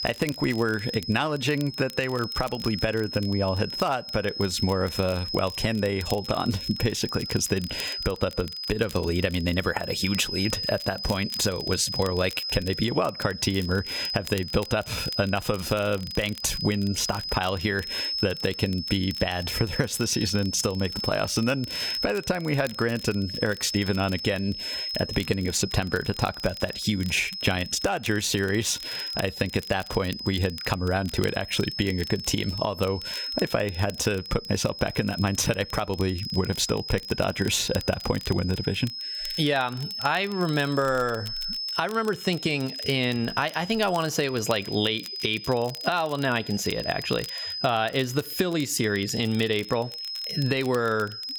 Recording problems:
squashed, flat; somewhat
high-pitched whine; loud; throughout; 5 kHz, 7 dB below the speech
crackle, like an old record; noticeable; 20 dB below the speech

